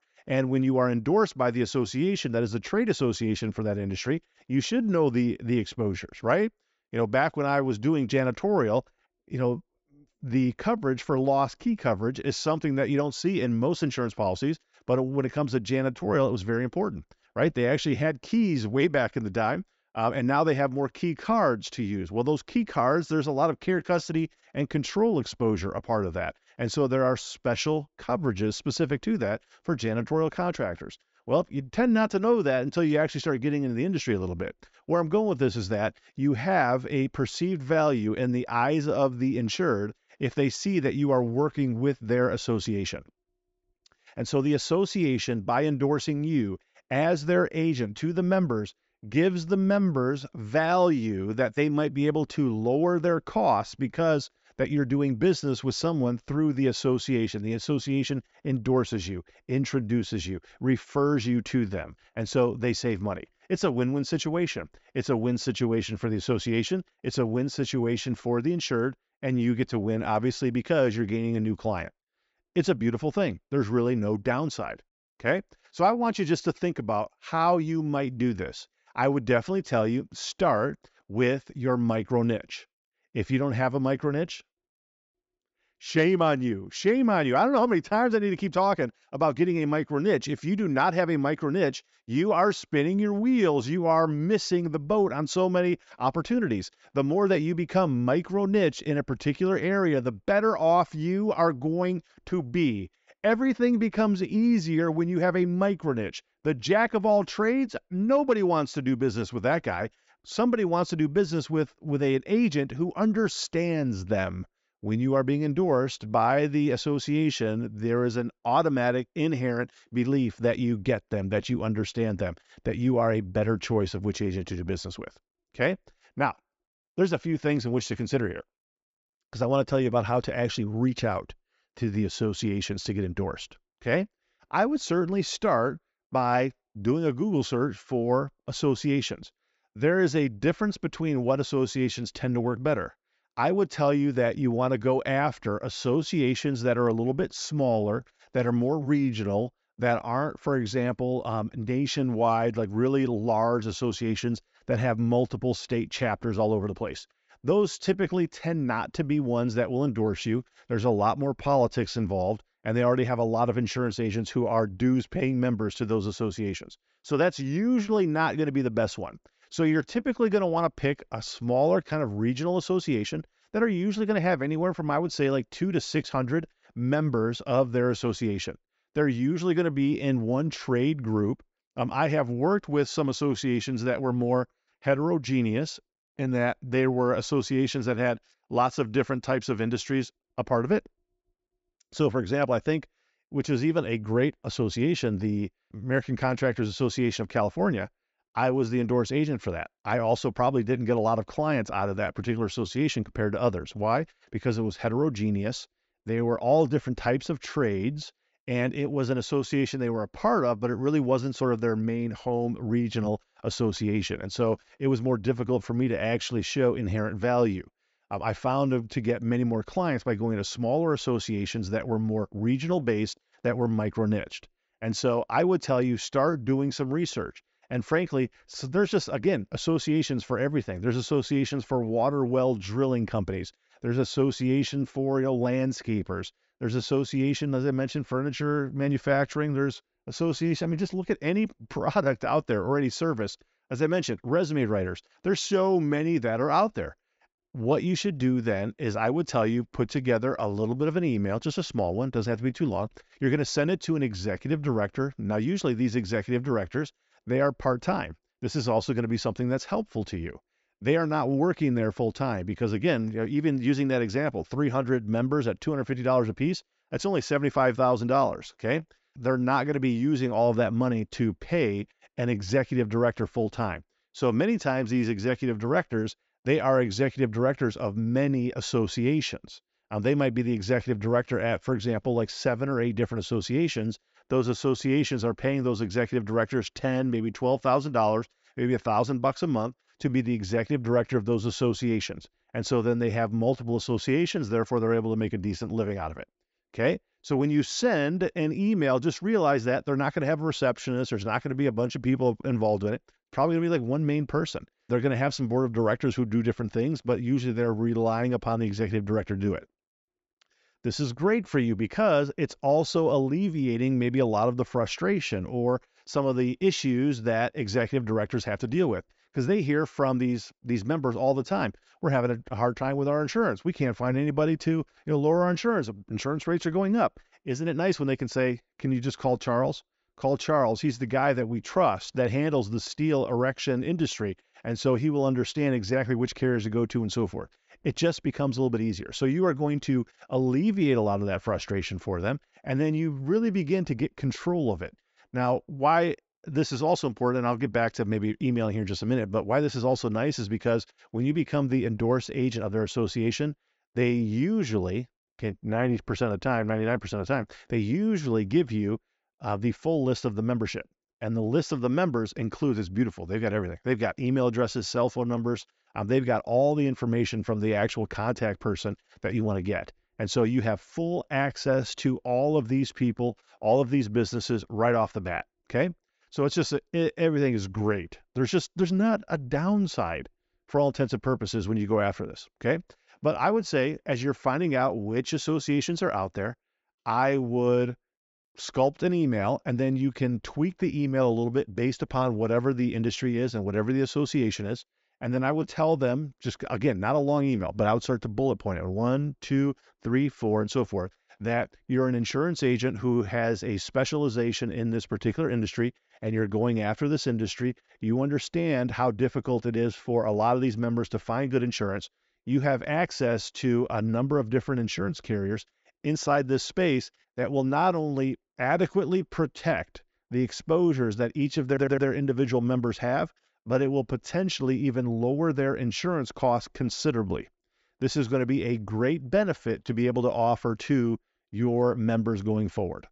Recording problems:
high frequencies cut off; noticeable; nothing above 8 kHz
audio stuttering; at 7:02

